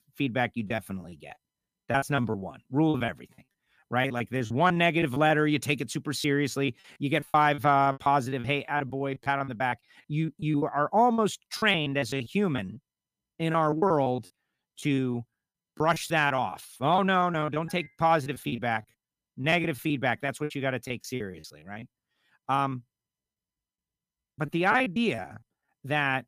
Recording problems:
choppy; very; 15% of the speech affected

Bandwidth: 15 kHz